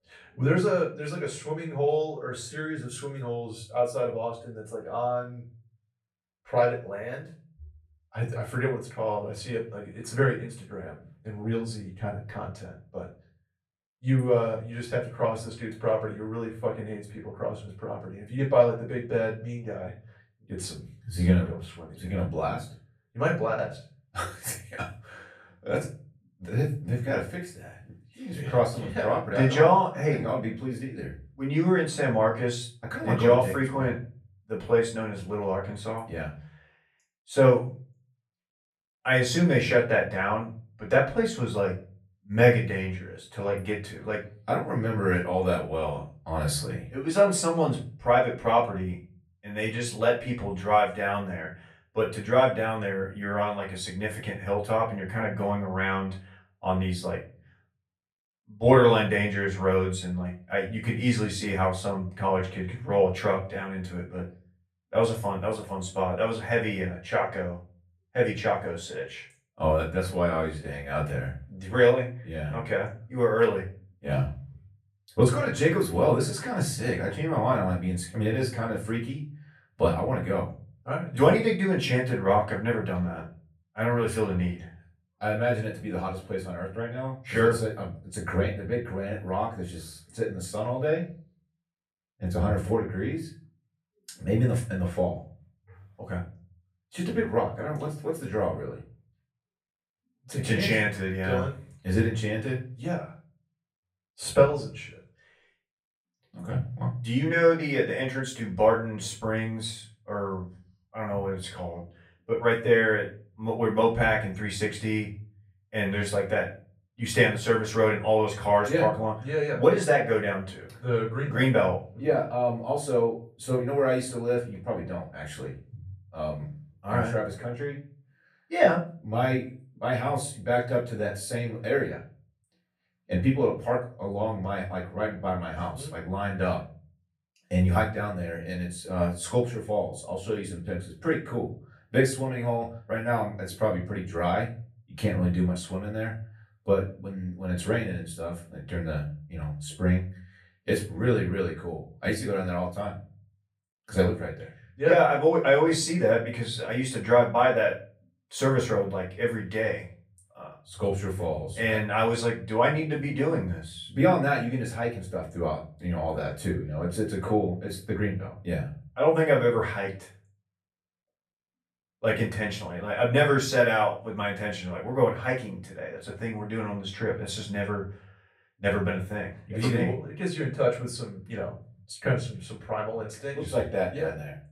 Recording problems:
off-mic speech; far
room echo; slight; dies away in 0.3 s

